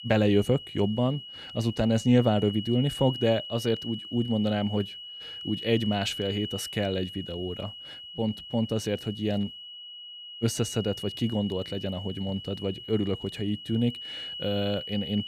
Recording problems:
high-pitched whine; loud; throughout; 3 kHz, 10 dB below the speech

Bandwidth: 14.5 kHz